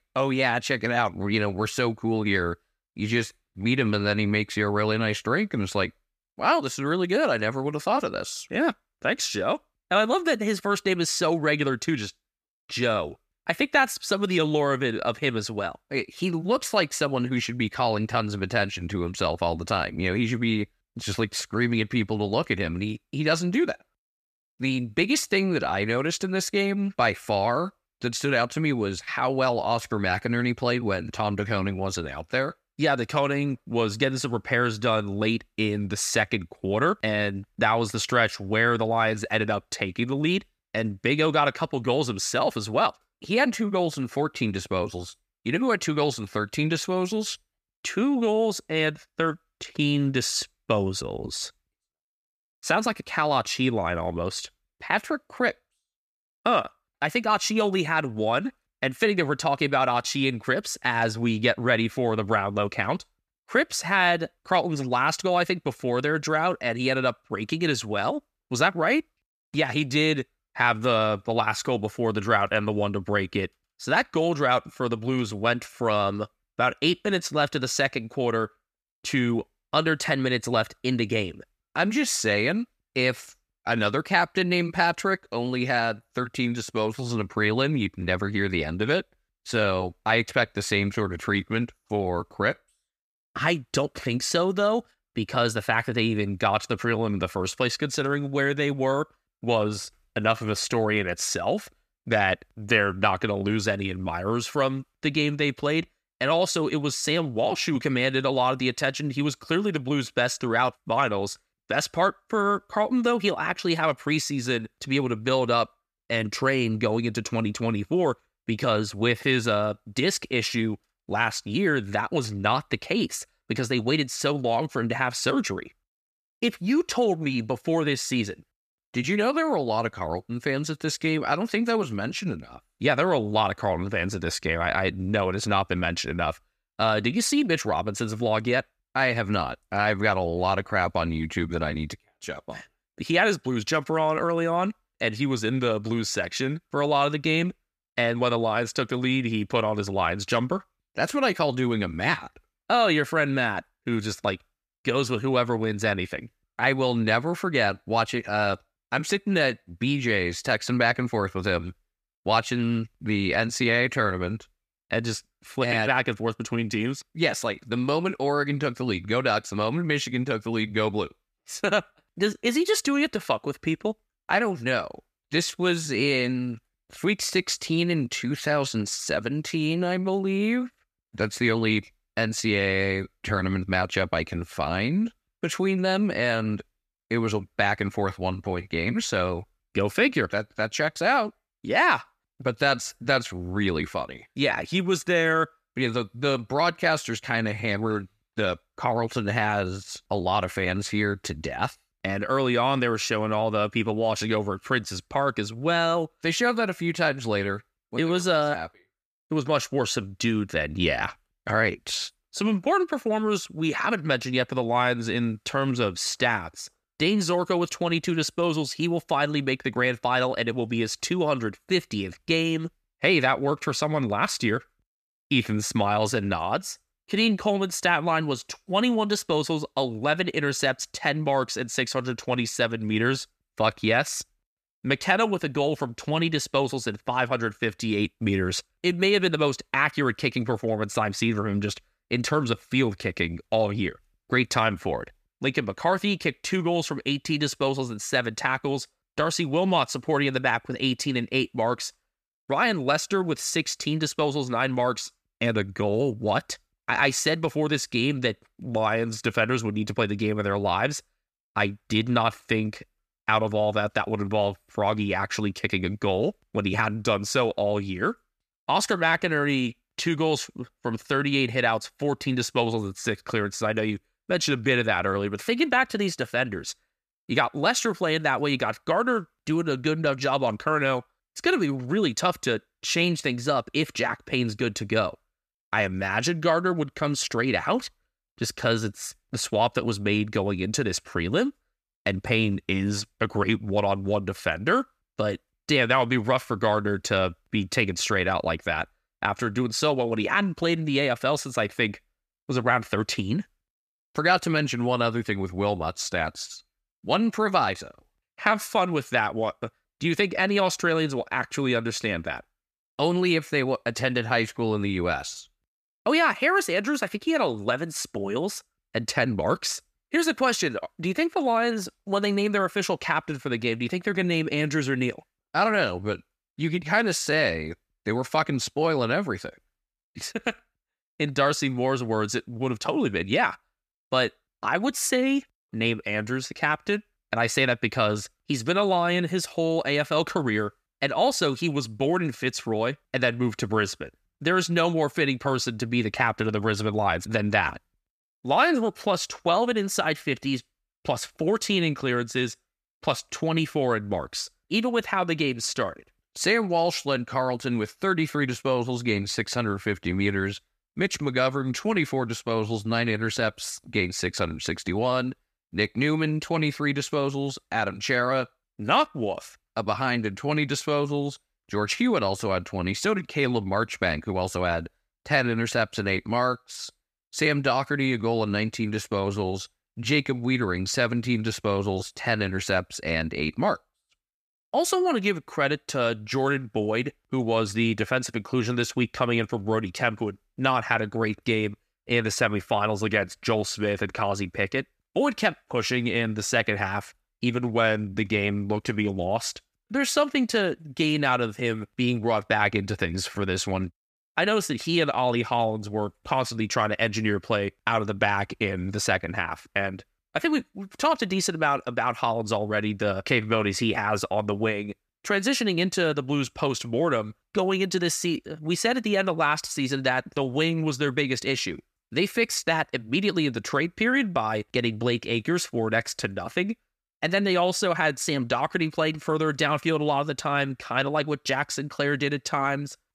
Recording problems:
none

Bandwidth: 14.5 kHz